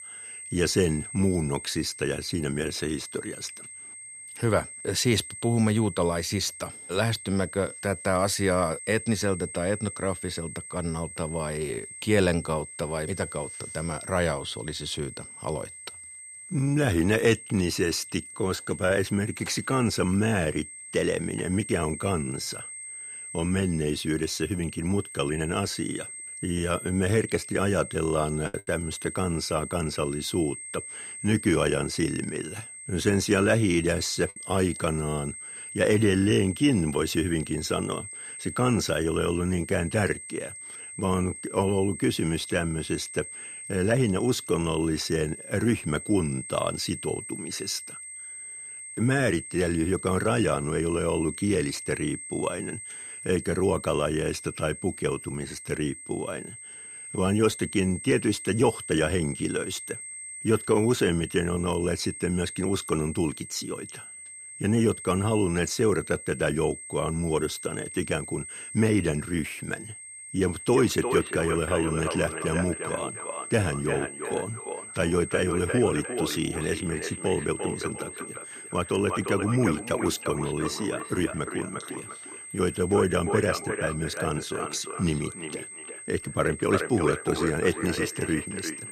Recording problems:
echo of what is said; strong; from 1:11 on; 350 ms later, 7 dB below the speech
high-pitched whine; noticeable; throughout; 8.5 kHz, 10 dB below the speech
choppy; occasionally; at 28 s; 3% of the speech affected

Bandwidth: 14 kHz